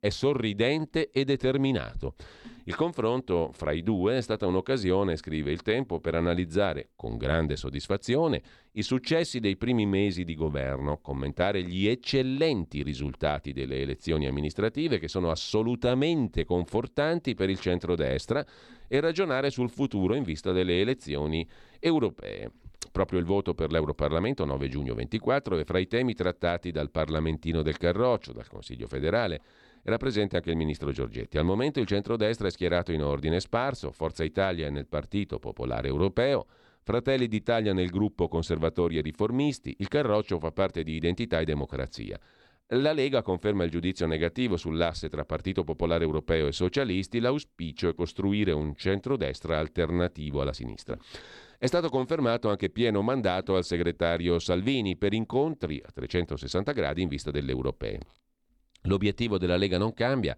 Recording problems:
none

